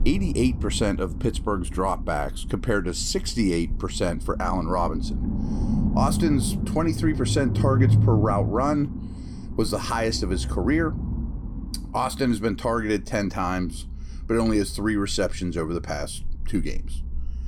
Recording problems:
low rumble; noticeable; throughout; 10 dB below the speech

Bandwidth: 17 kHz